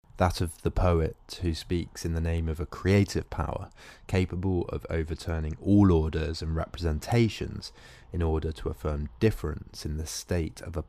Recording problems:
none

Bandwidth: 15 kHz